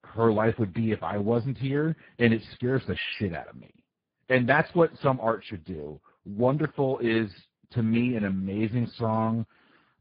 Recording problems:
garbled, watery; badly; nothing above 5 kHz

